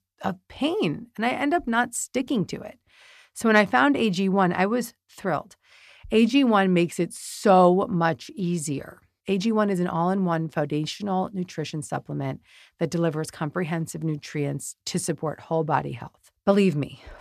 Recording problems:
none

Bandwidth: 14 kHz